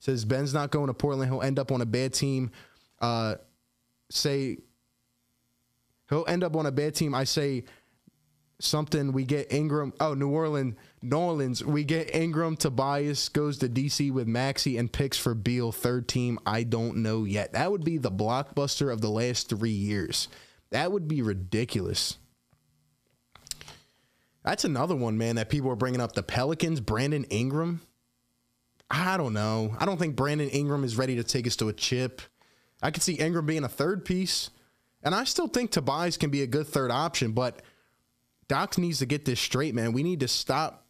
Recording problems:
squashed, flat; heavily

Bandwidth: 14.5 kHz